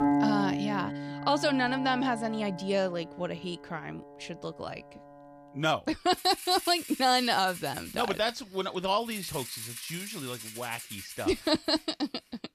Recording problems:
background music; loud; throughout; 7 dB below the speech

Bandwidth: 14.5 kHz